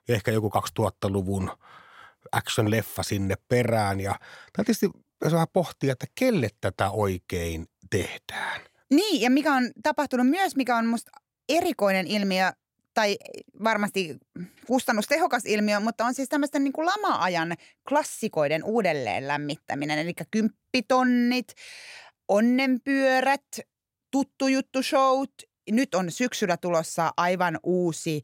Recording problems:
none

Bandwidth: 16.5 kHz